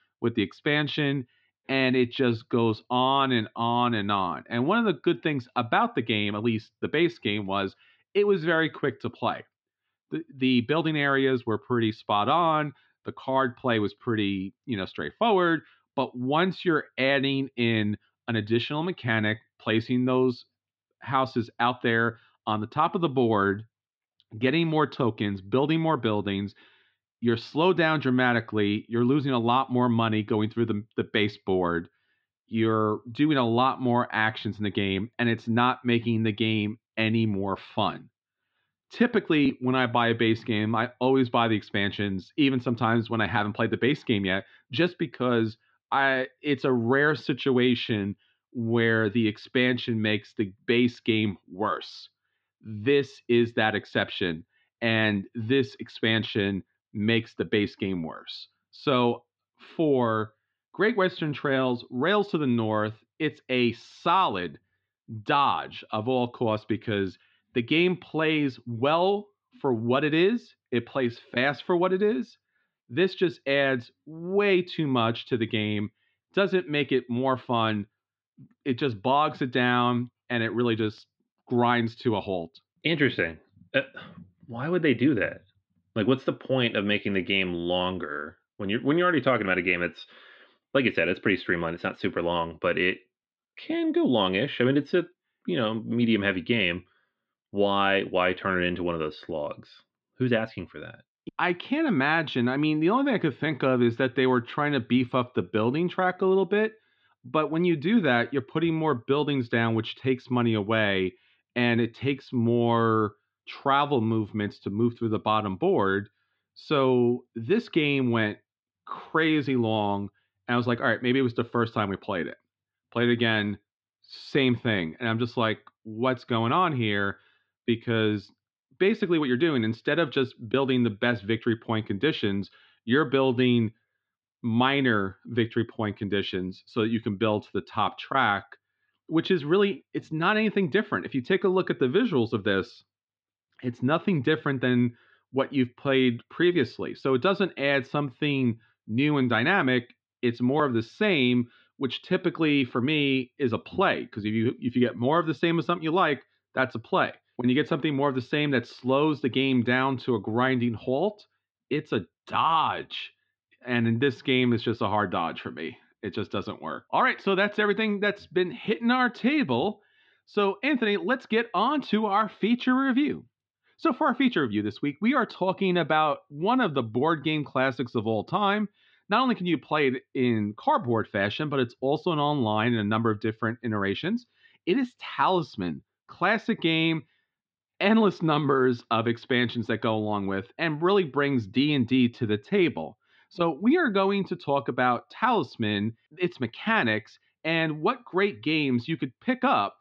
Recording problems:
muffled; slightly; fading above 4 kHz

